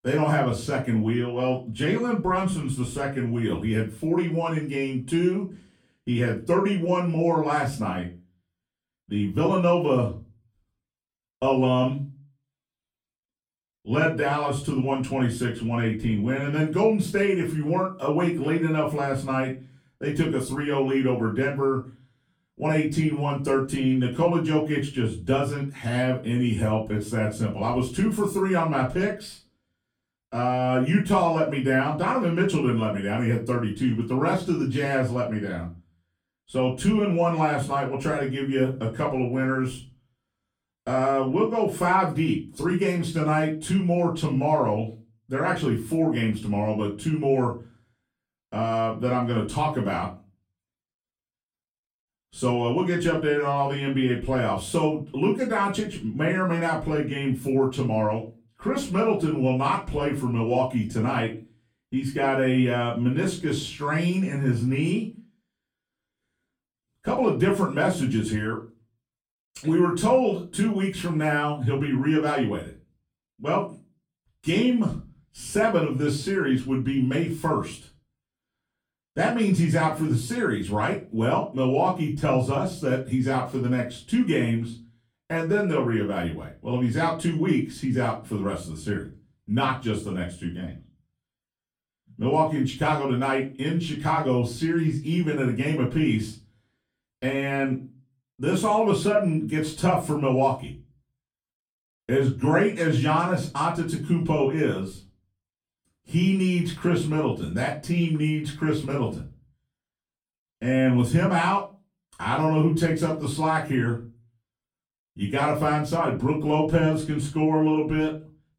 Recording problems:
off-mic speech; far
room echo; slight; dies away in 0.3 s

